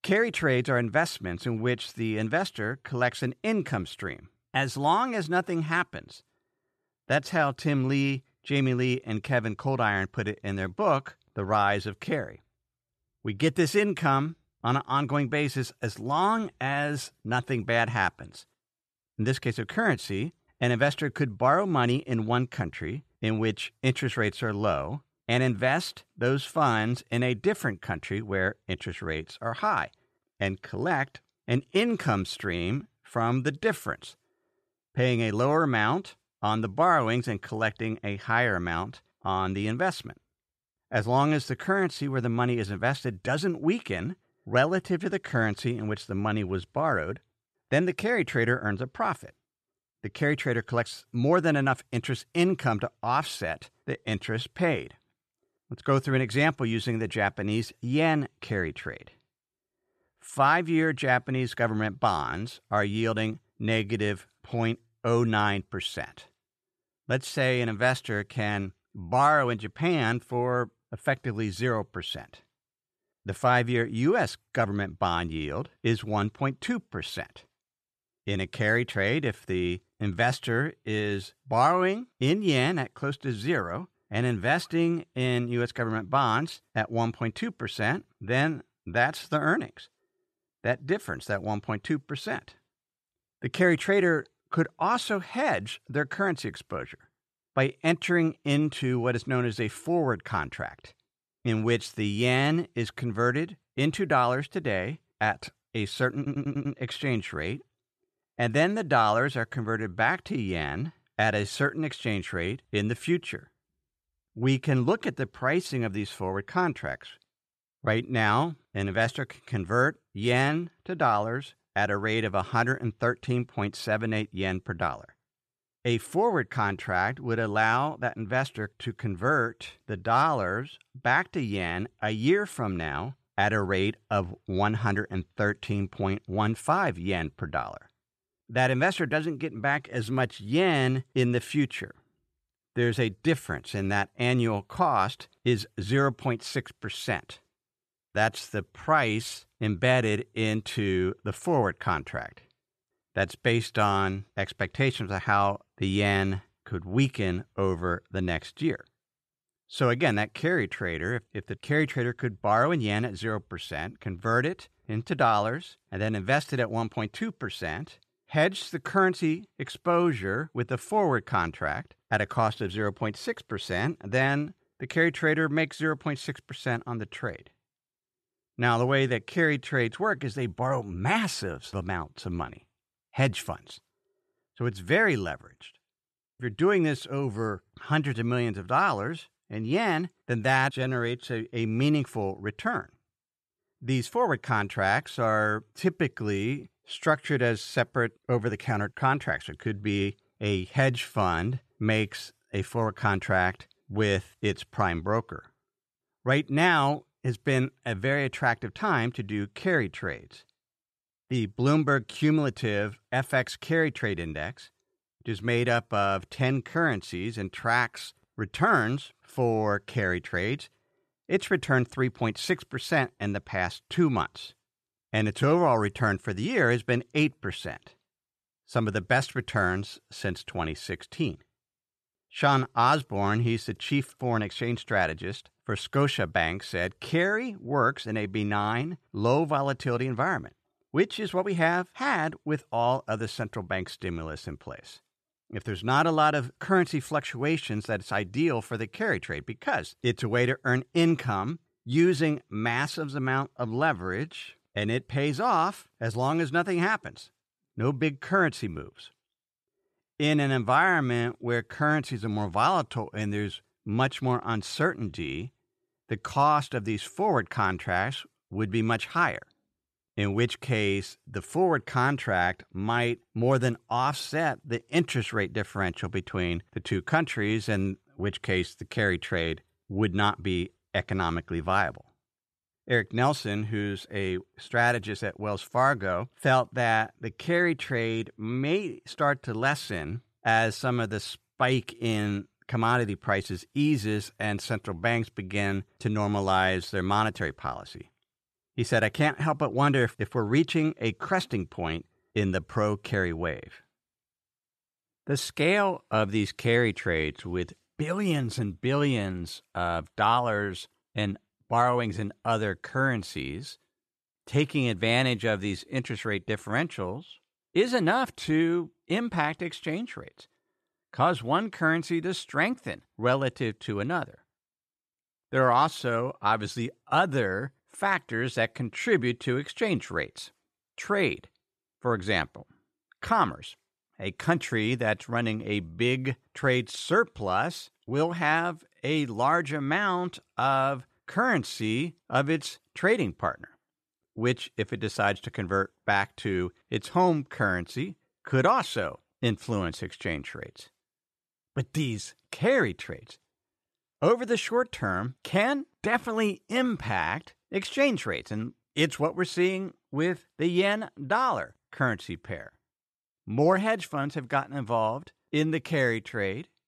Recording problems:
audio stuttering; at 1:46

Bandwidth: 13.5 kHz